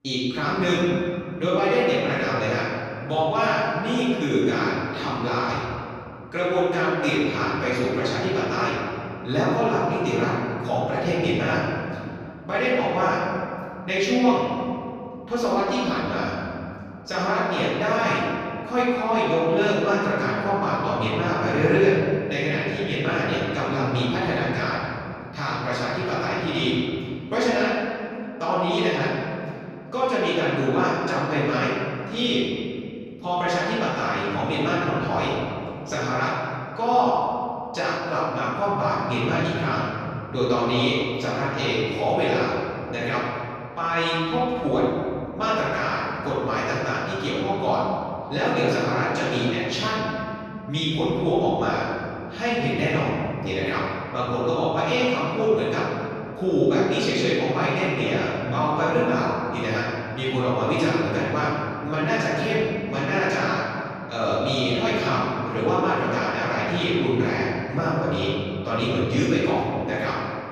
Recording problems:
room echo; strong; dies away in 2.5 s
off-mic speech; far

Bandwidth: 14.5 kHz